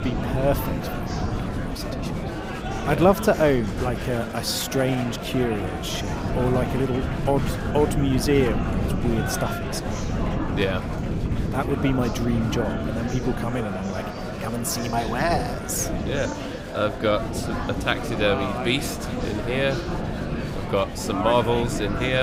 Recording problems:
murmuring crowd; loud; throughout; 6 dB below the speech
animal sounds; noticeable; throughout; 10 dB below the speech
wind noise on the microphone; occasional gusts; 15 dB below the speech
abrupt cut into speech; at the end

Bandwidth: 15.5 kHz